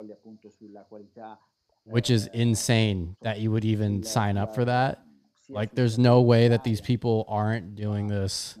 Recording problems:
voice in the background; faint; throughout; 20 dB below the speech

